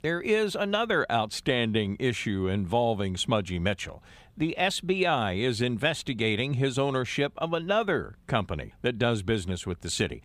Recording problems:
none

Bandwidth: 15 kHz